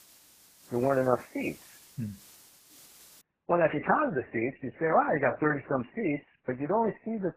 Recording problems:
garbled, watery; badly; nothing above 2.5 kHz
hiss; faint; until 3 s; 25 dB below the speech
high-pitched whine; very faint; throughout; 2 kHz, 70 dB below the speech

